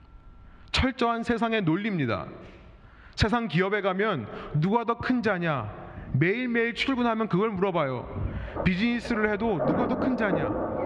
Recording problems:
muffled; very slightly; fading above 2 kHz
squashed, flat; somewhat, background pumping
rain or running water; loud; throughout; 5 dB below the speech

